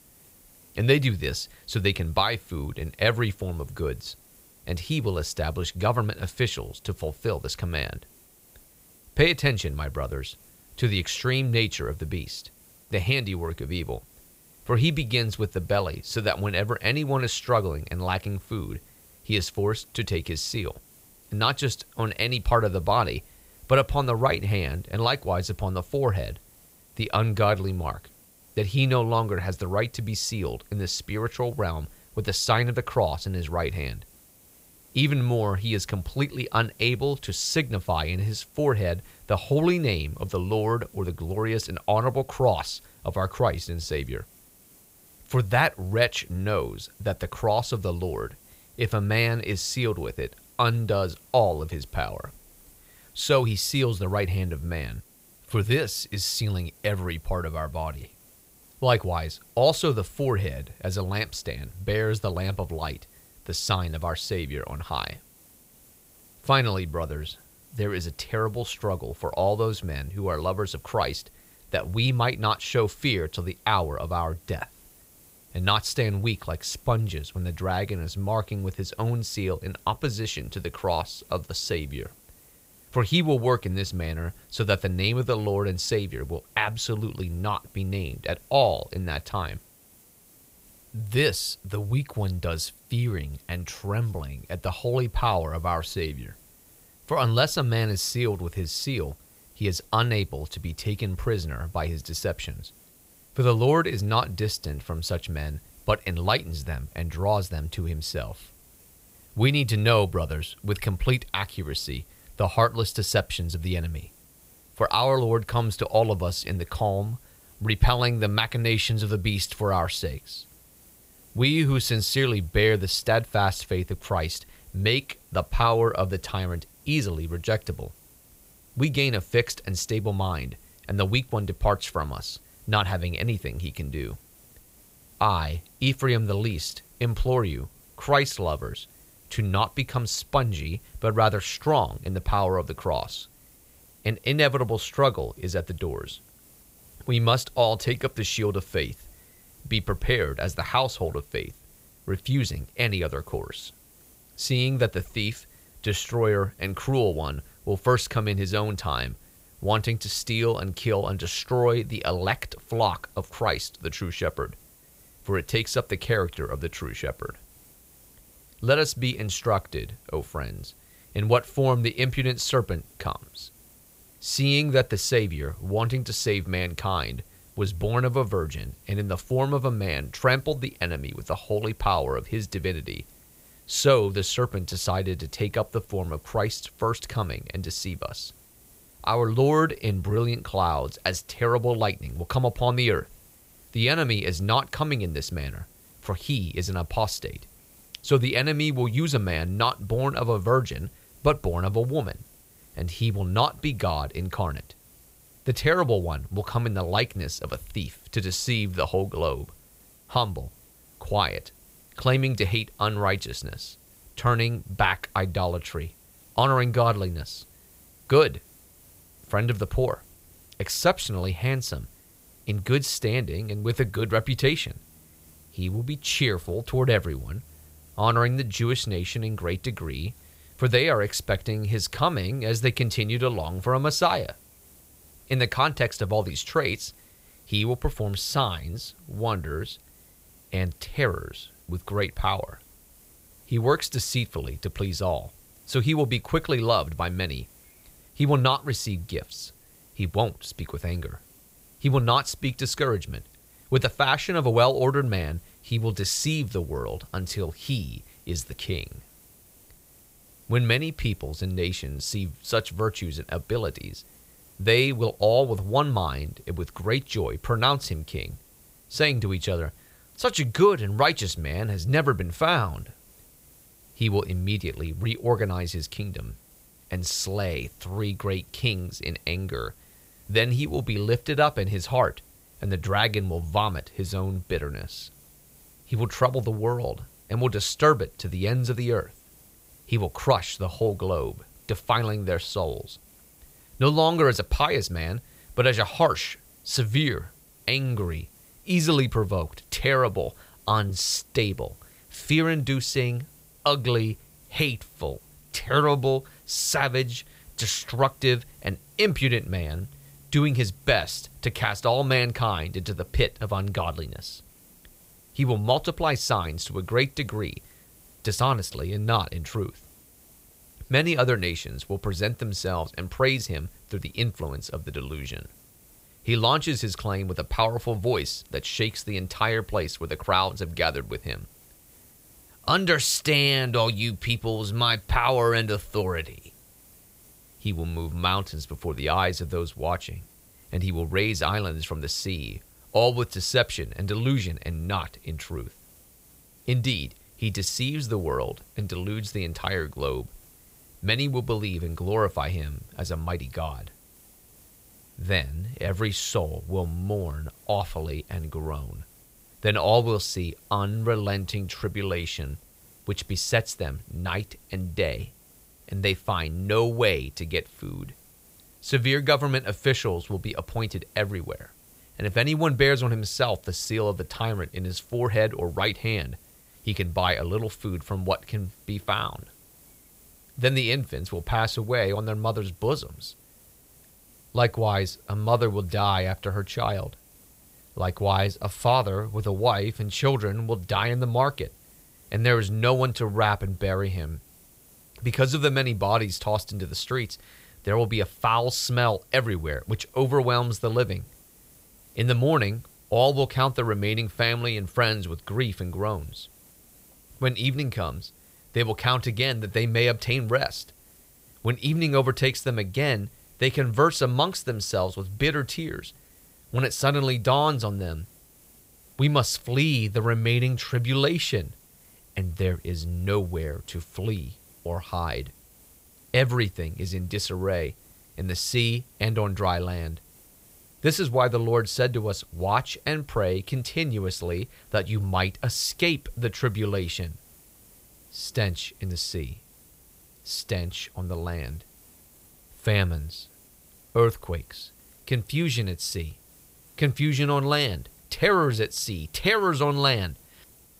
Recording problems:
hiss; faint; throughout; 25 dB below the speech

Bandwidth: 15.5 kHz